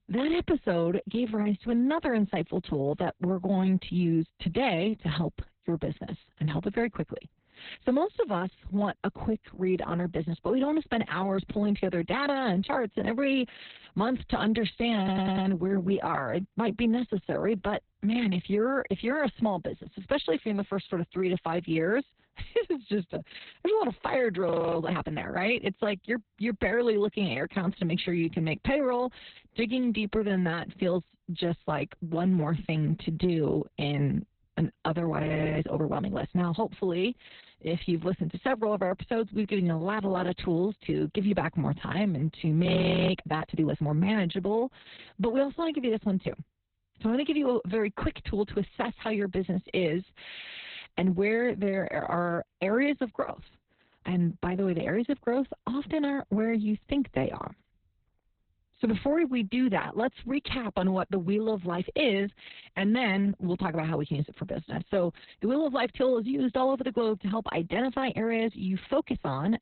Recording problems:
garbled, watery; badly; nothing above 4 kHz
audio stuttering; at 15 s and at 50 s
audio freezing; at 24 s, at 35 s and at 43 s

